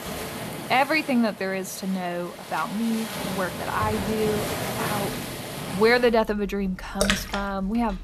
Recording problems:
rain or running water; loud; throughout; 5 dB below the speech

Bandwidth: 14 kHz